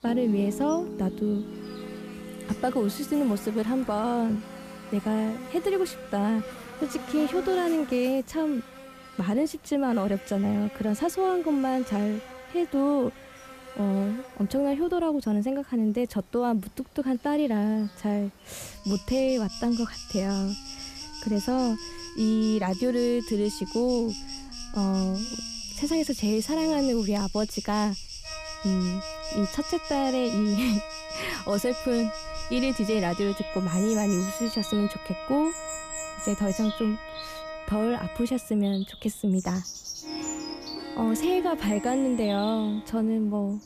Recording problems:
animal sounds; noticeable; throughout; 10 dB below the speech
background music; noticeable; throughout; 10 dB below the speech

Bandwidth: 14.5 kHz